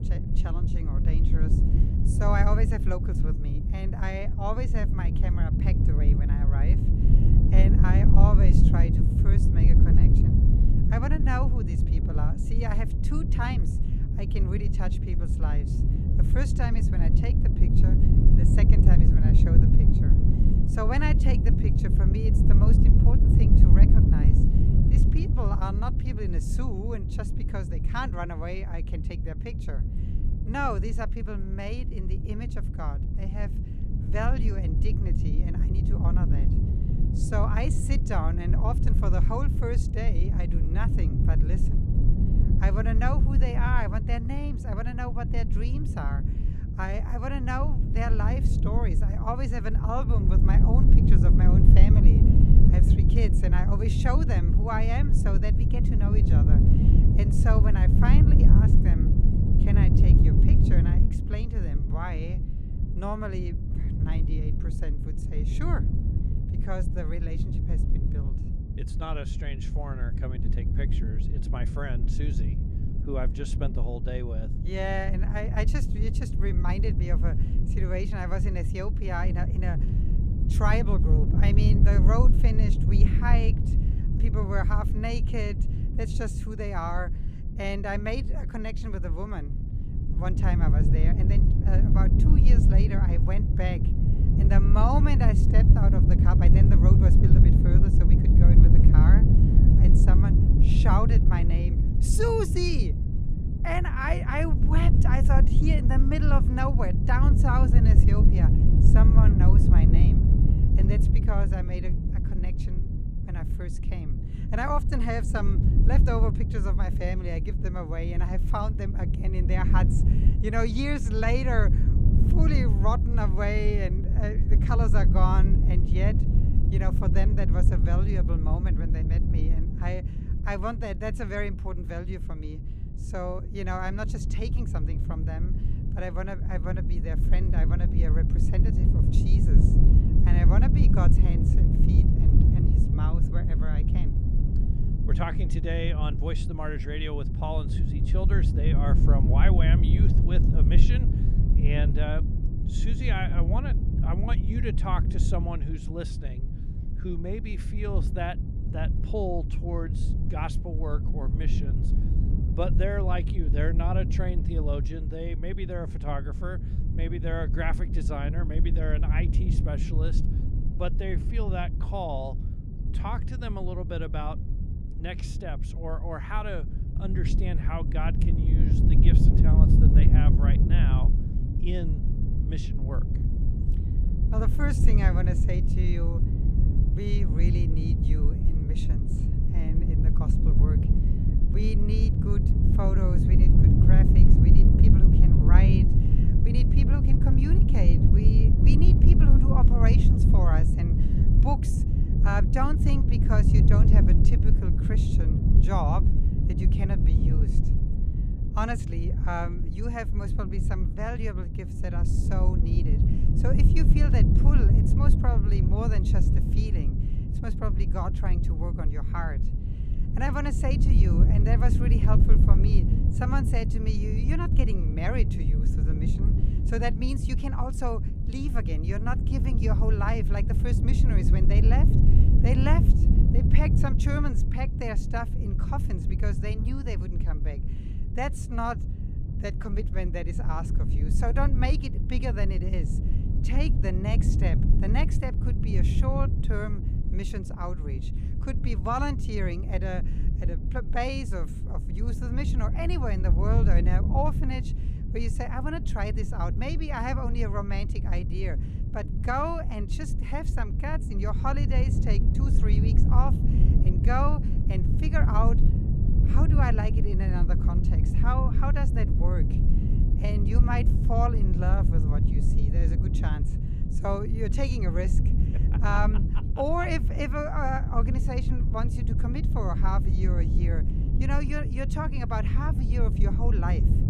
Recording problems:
low rumble; loud; throughout; 3 dB below the speech

